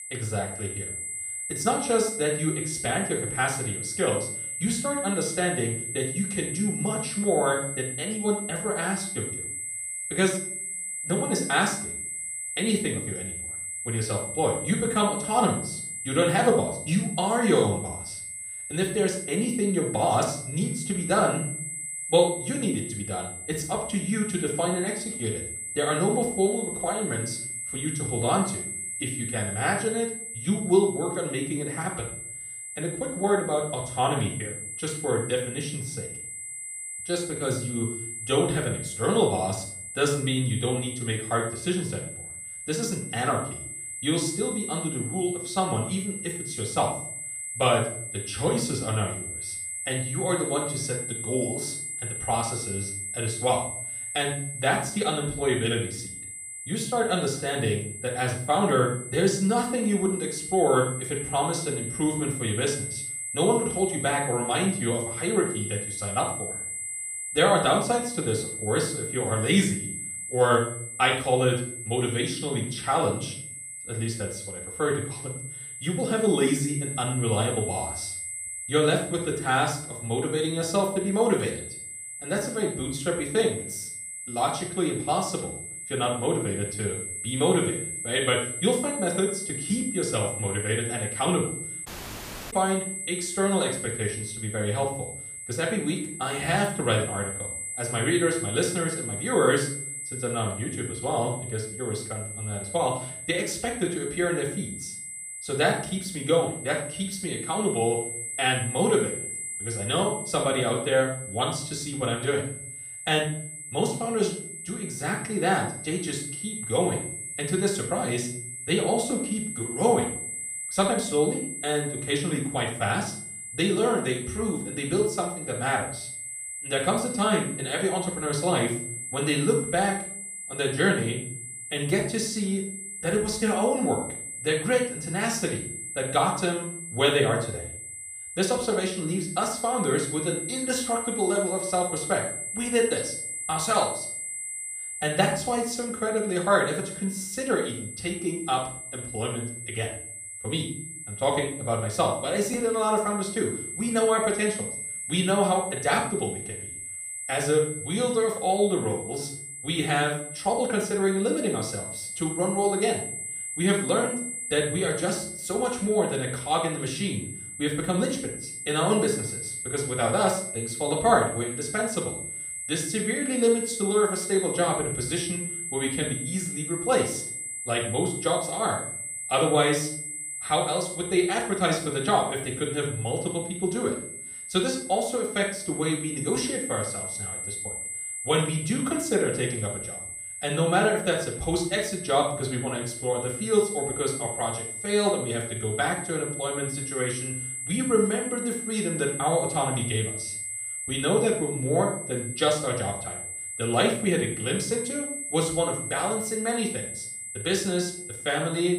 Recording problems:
off-mic speech; far
room echo; slight; dies away in 0.4 s
high-pitched whine; loud; throughout; 8 kHz, 6 dB below the speech
audio cutting out; at 1:32 for 0.5 s

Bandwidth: 14.5 kHz